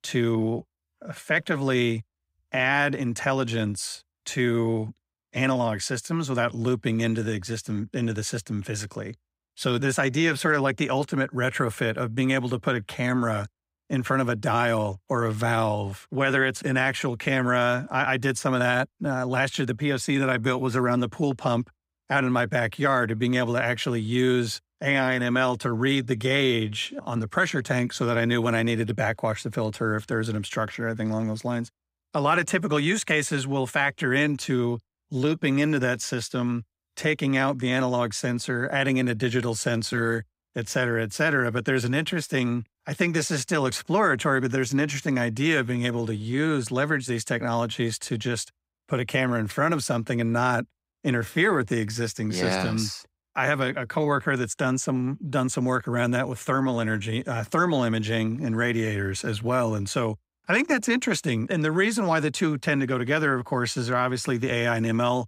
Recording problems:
none

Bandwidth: 15.5 kHz